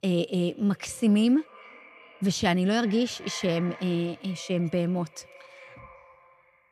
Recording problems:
echo of what is said; faint; throughout; 390 ms later, 20 dB below the speech

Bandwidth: 14.5 kHz